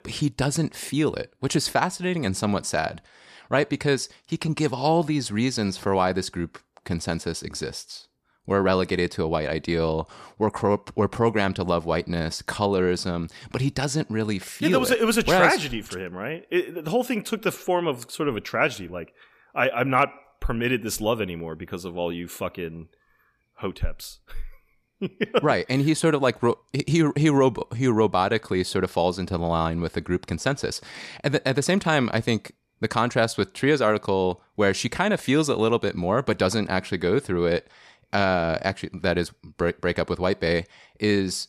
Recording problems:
none

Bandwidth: 14.5 kHz